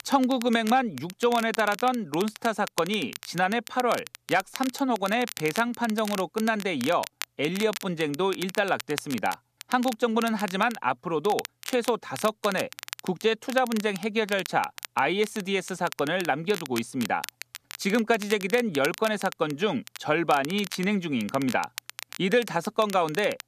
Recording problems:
crackle, like an old record; noticeable; 15 dB below the speech

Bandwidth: 14.5 kHz